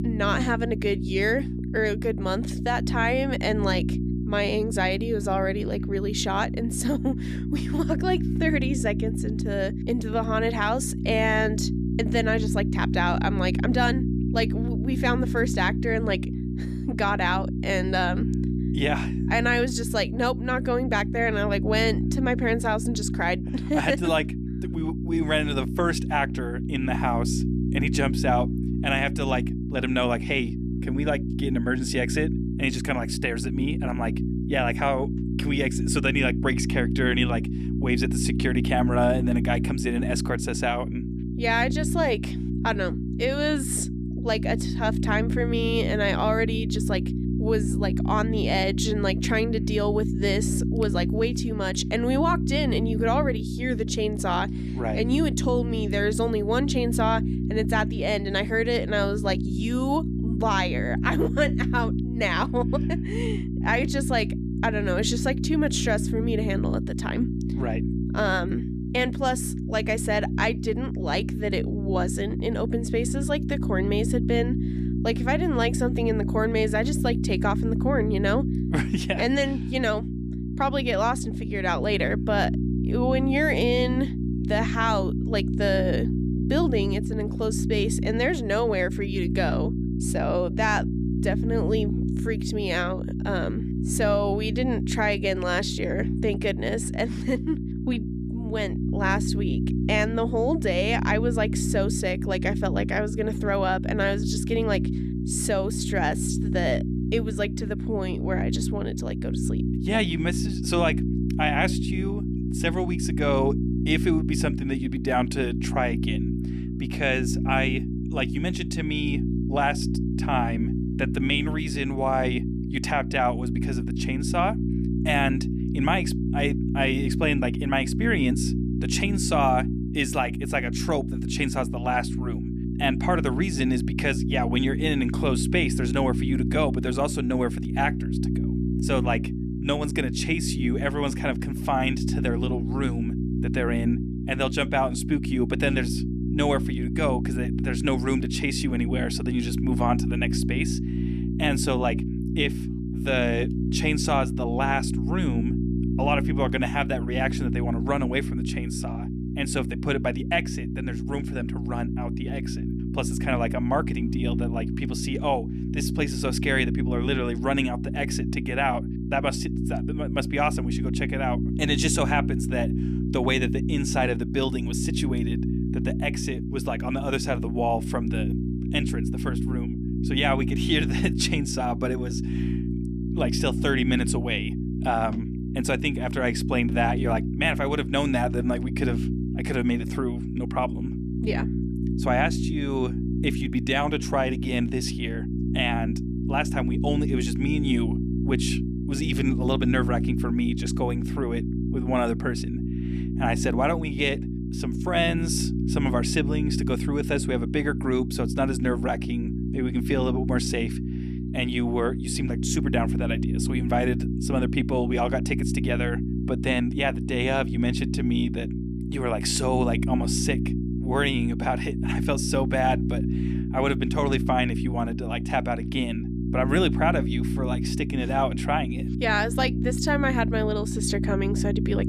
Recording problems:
electrical hum; loud; throughout; 60 Hz, 8 dB below the speech

